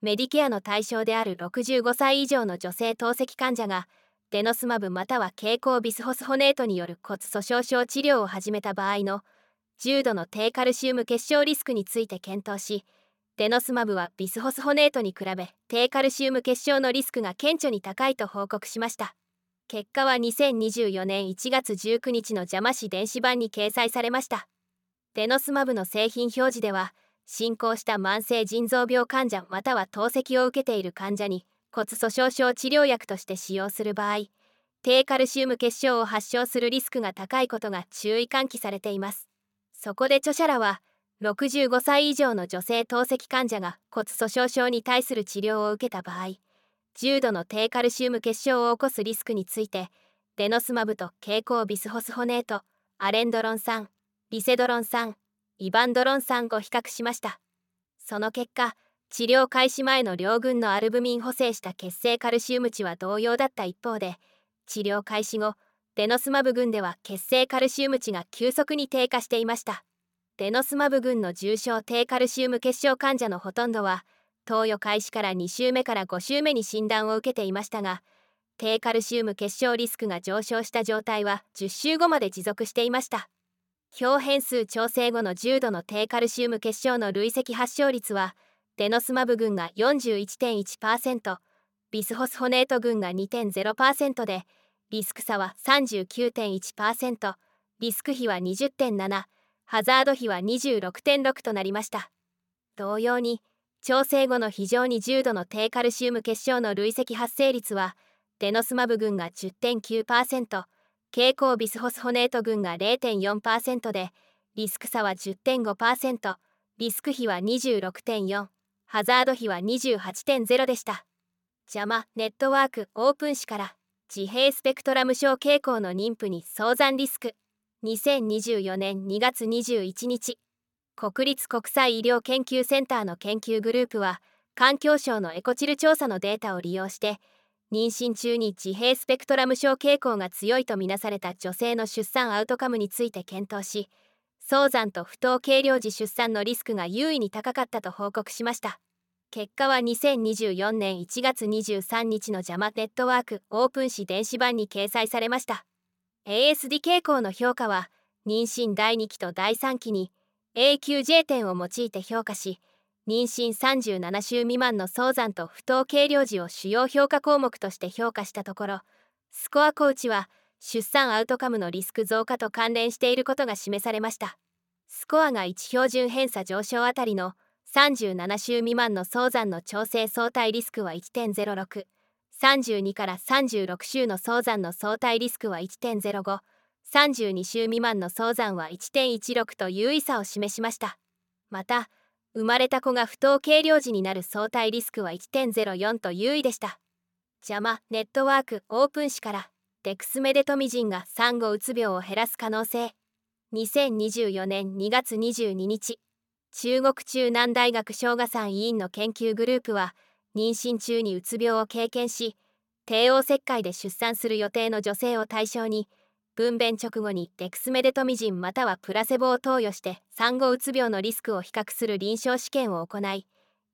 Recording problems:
none

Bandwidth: 18 kHz